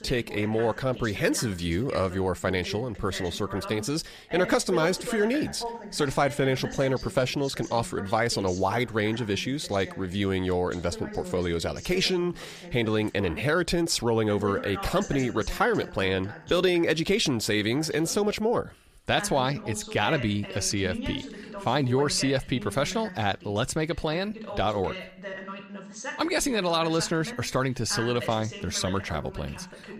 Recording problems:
voice in the background; noticeable; throughout; 15 dB below the speech

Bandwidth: 14.5 kHz